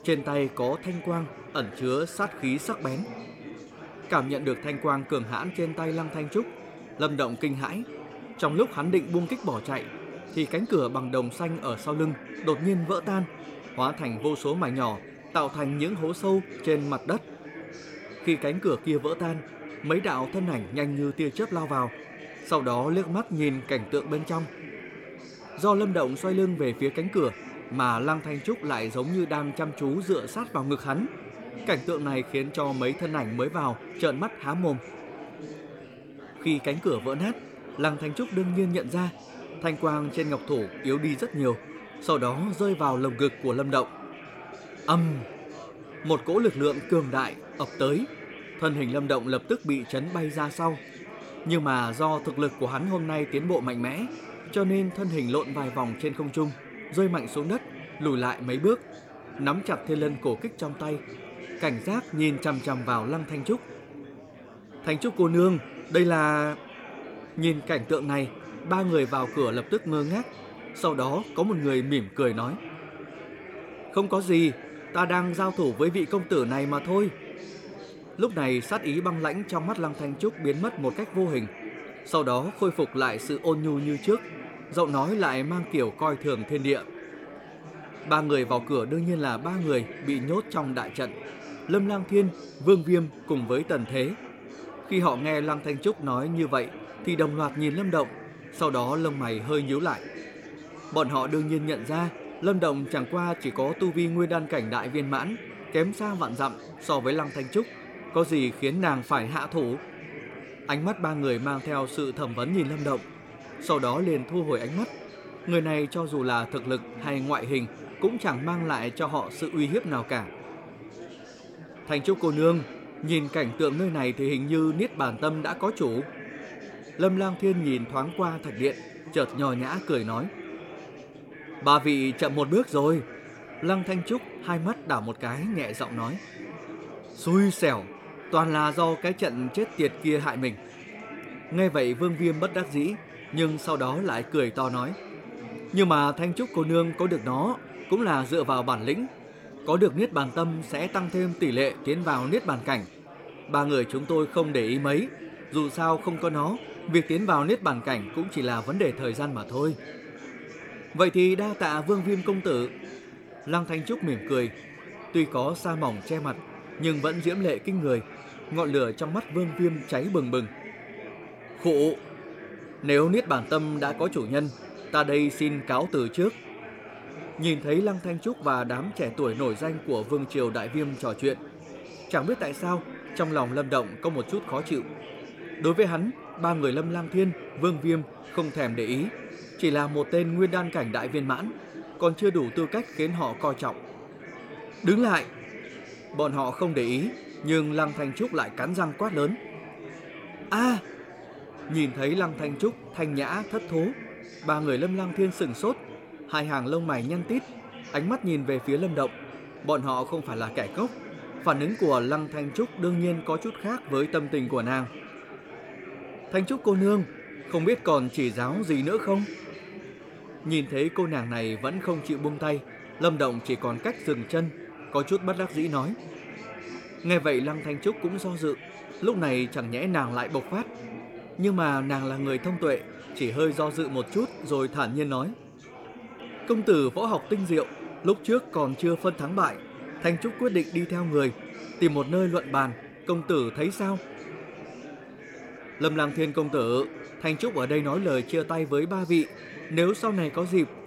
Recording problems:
chatter from many people; noticeable; throughout; 15 dB below the speech

